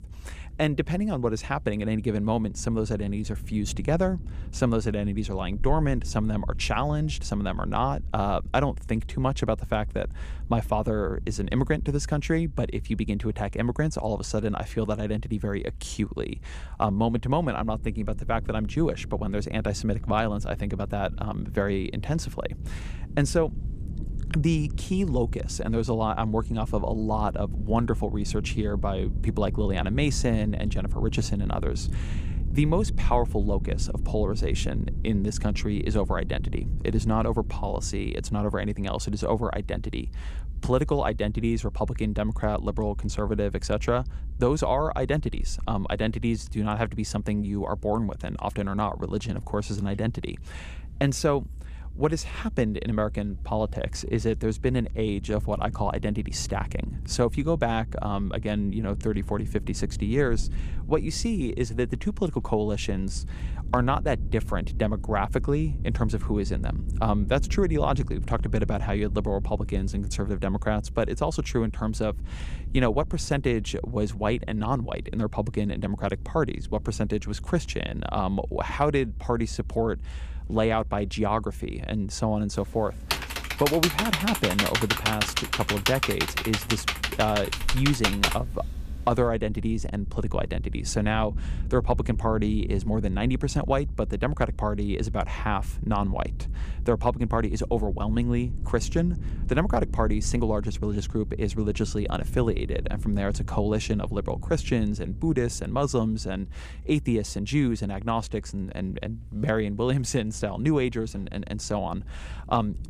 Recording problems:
low rumble; faint; throughout; 20 dB below the speech
keyboard typing; loud; from 1:23 to 1:28; peak 4 dB above the speech

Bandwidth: 14.5 kHz